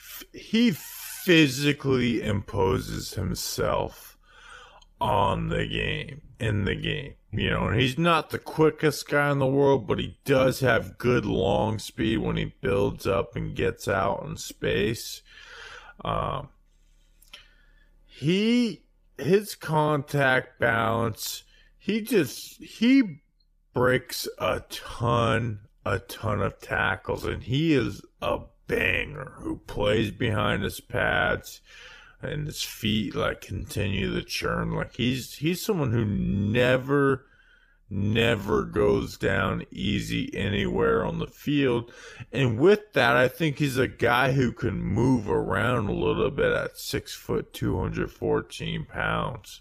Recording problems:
wrong speed, natural pitch; too slow; 0.6 times normal speed

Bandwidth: 15 kHz